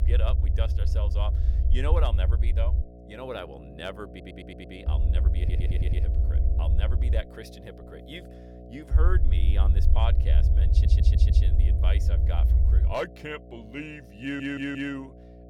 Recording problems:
low rumble; loud; until 3 s, from 5 to 7 s and from 9 to 13 s; 7 dB below the speech
electrical hum; noticeable; throughout; 60 Hz, 15 dB below the speech
audio stuttering; 4 times, first at 4 s

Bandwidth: 18 kHz